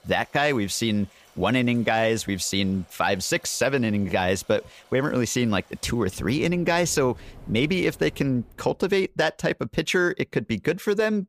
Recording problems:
rain or running water; faint; until 8.5 s; 25 dB below the speech

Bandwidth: 15 kHz